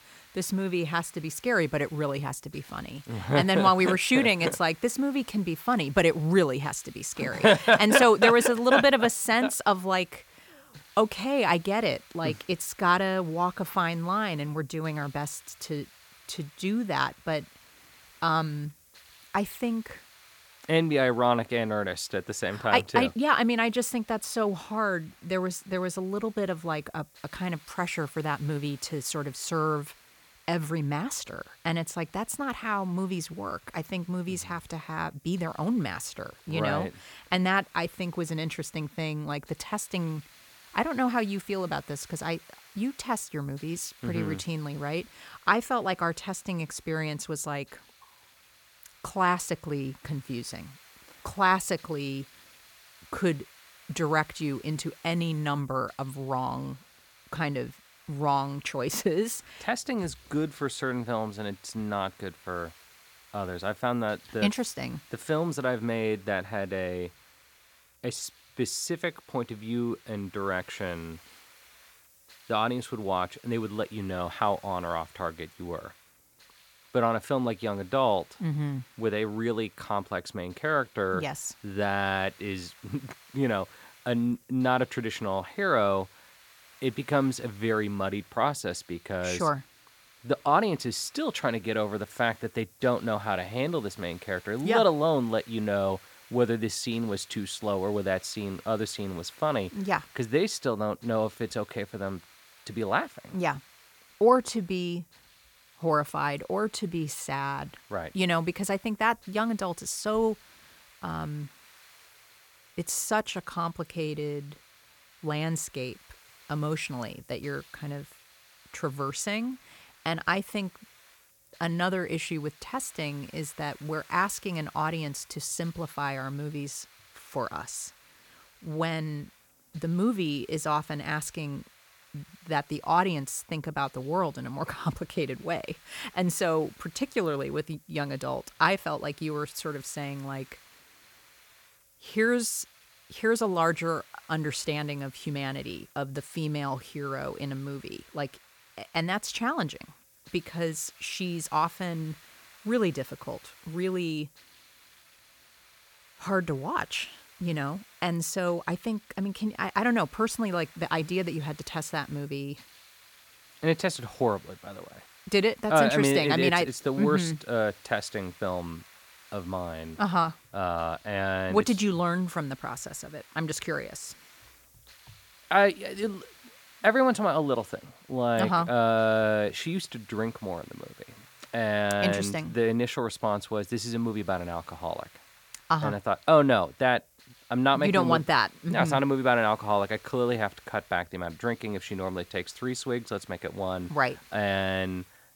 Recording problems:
hiss; faint; throughout; 25 dB below the speech

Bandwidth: 17.5 kHz